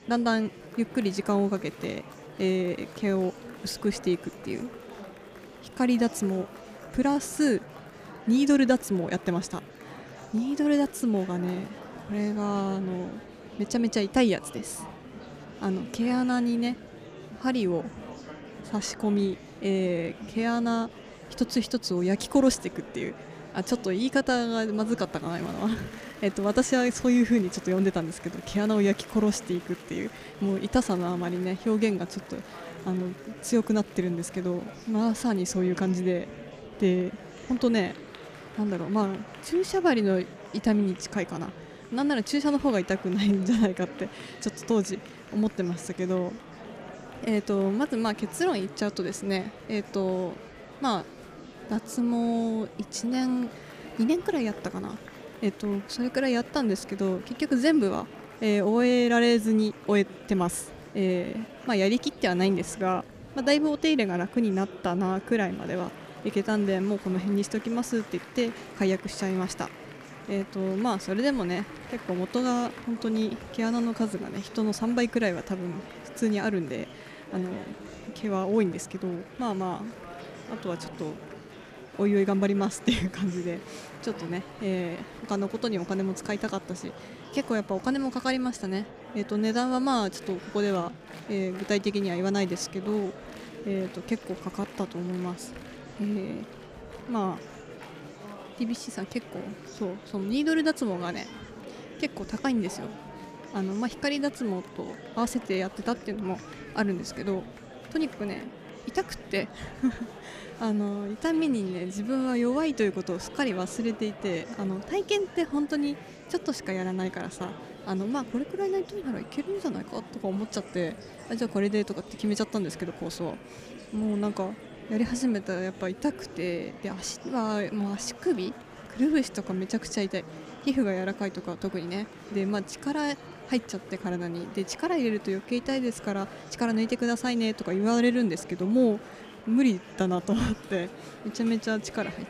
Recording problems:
murmuring crowd; noticeable; throughout; 15 dB below the speech

